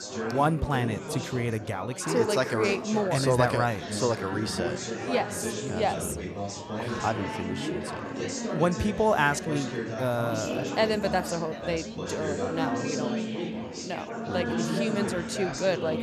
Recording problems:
chatter from many people; loud; throughout; 4 dB below the speech

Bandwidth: 13.5 kHz